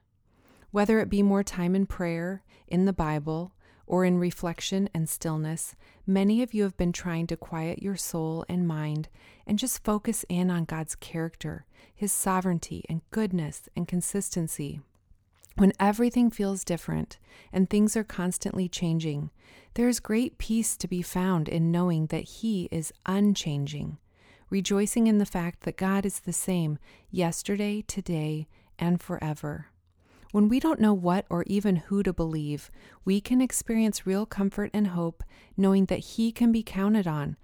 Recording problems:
none

